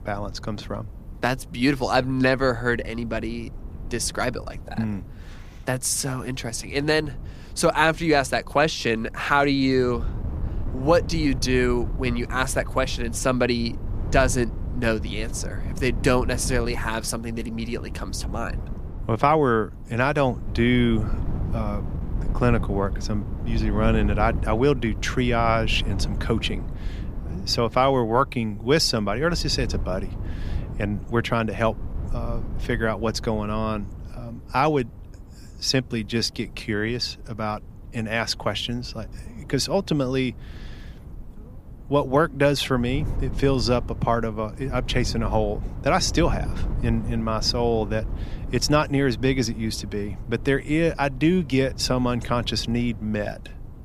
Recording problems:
wind noise on the microphone; occasional gusts; 20 dB below the speech

